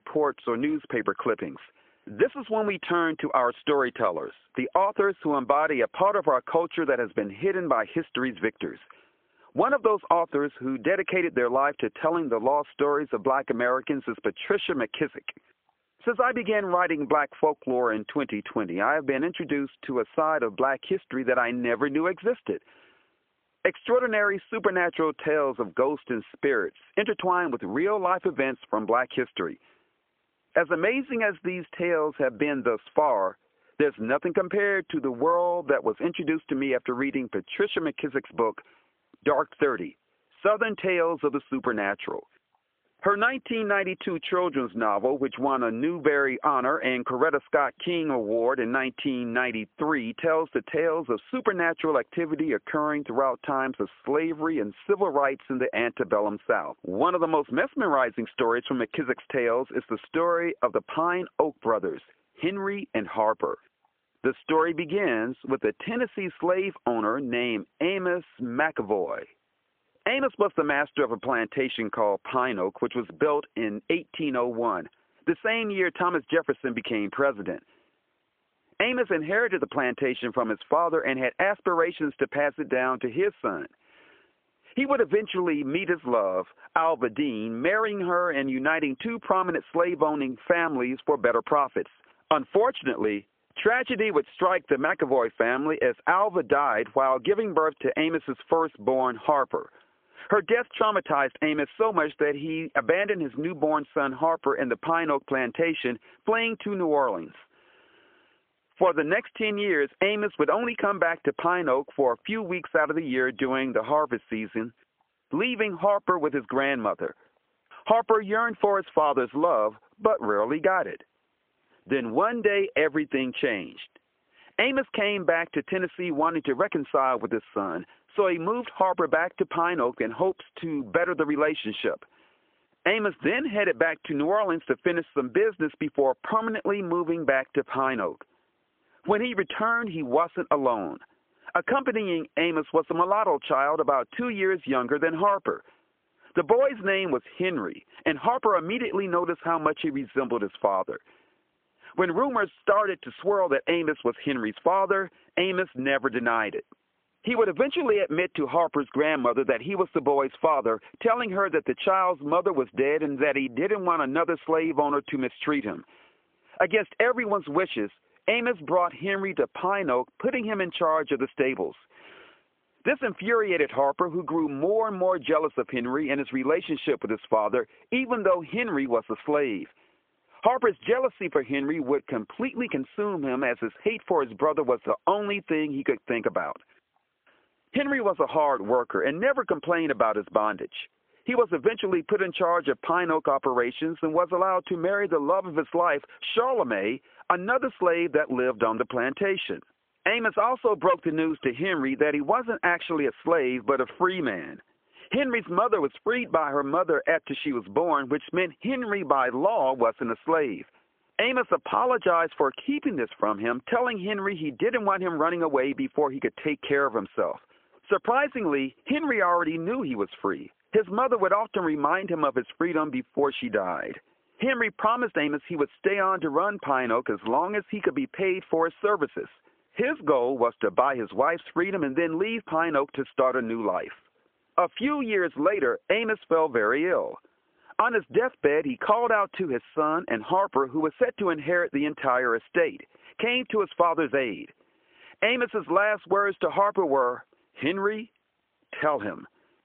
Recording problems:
phone-call audio; poor line; nothing above 3.5 kHz
squashed, flat; somewhat

